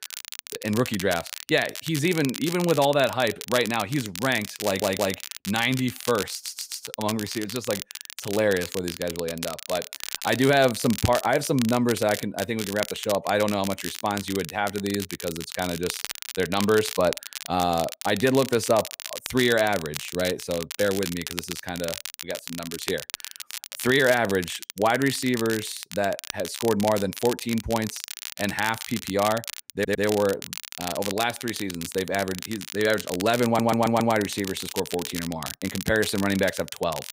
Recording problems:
crackle, like an old record; loud; 9 dB below the speech
audio stuttering; 4 times, first at 4.5 s

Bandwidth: 15.5 kHz